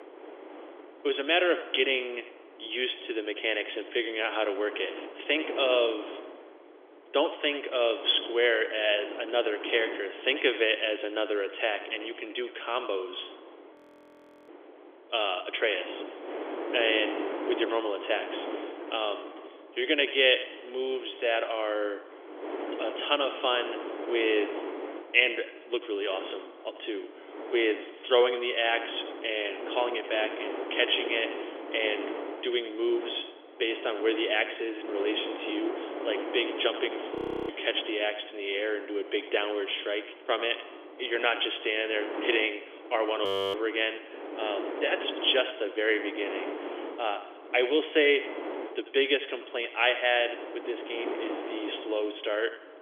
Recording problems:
thin; very; fading below 400 Hz
echo of what is said; noticeable; throughout; 90 ms later, 15 dB below the speech
phone-call audio; nothing above 3.5 kHz
wind noise on the microphone; occasional gusts; 10 dB below the speech
audio freezing; at 14 s for 0.5 s, at 37 s and at 43 s

